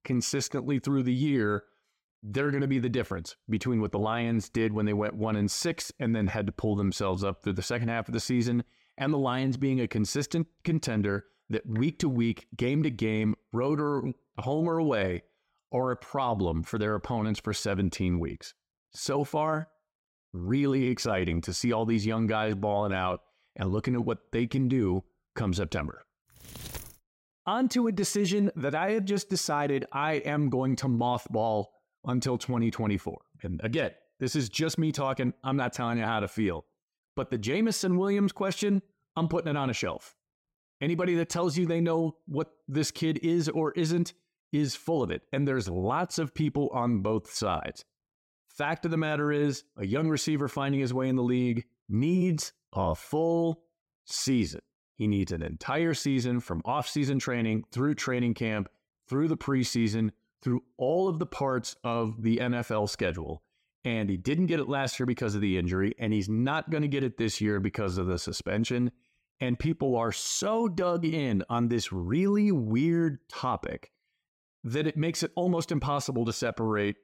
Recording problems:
none

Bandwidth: 16 kHz